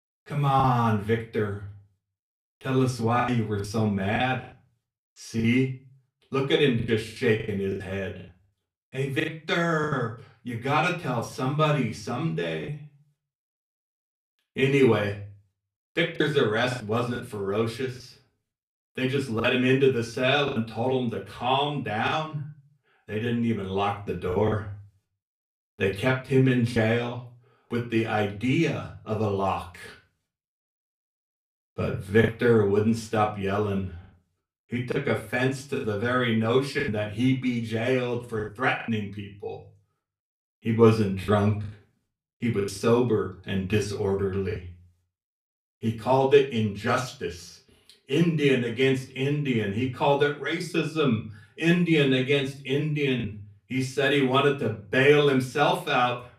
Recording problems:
off-mic speech; far
room echo; very slight; dies away in 0.3 s
choppy; occasionally; 4% of the speech affected

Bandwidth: 15 kHz